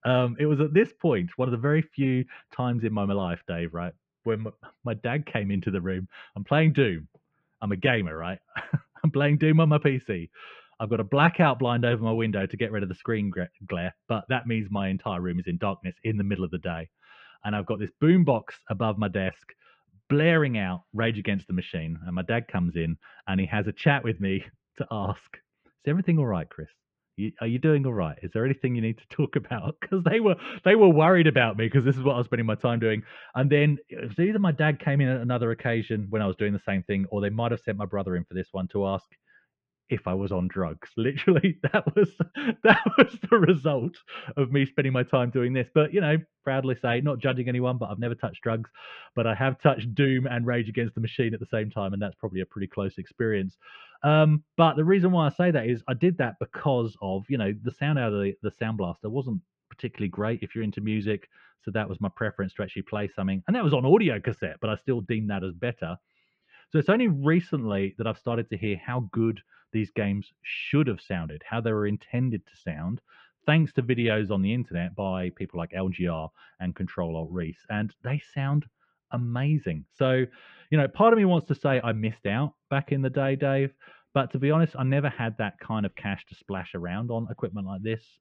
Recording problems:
muffled; very; fading above 2.5 kHz

